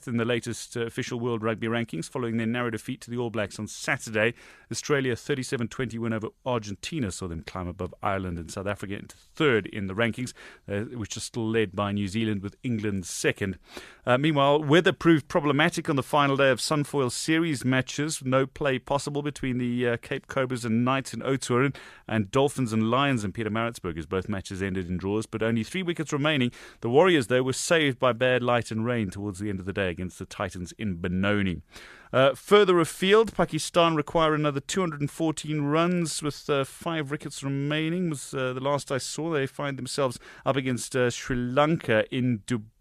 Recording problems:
none

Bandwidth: 14 kHz